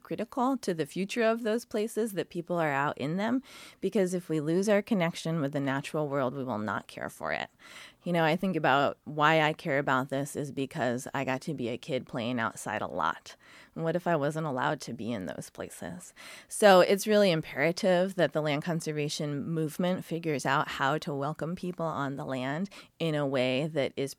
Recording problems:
none

